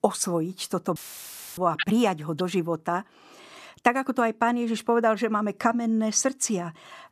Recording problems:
audio cutting out; filled with static; at 1 s for 0.5 s

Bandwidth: 14 kHz